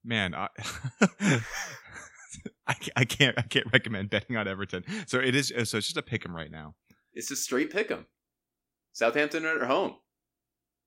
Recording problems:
none

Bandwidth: 16 kHz